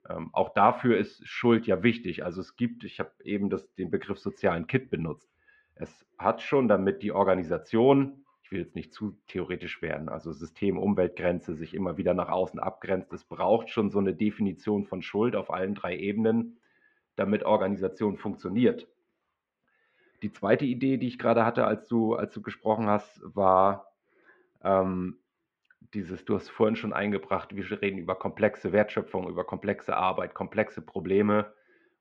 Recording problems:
muffled; very; fading above 2.5 kHz

